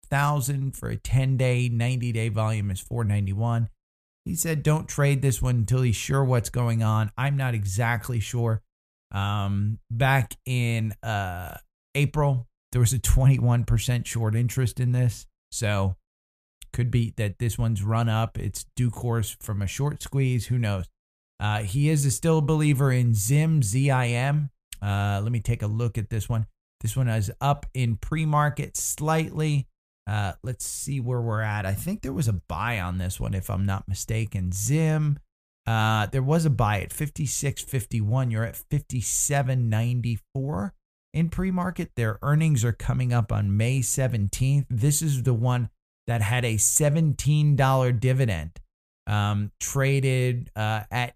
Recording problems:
none

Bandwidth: 14.5 kHz